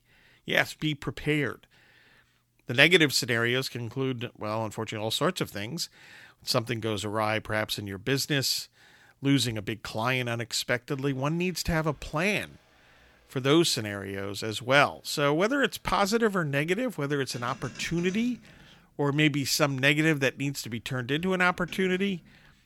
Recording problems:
traffic noise; faint; from 7 s on; 25 dB below the speech

